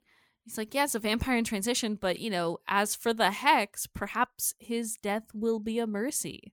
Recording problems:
uneven, jittery; slightly; from 0.5 to 5.5 s

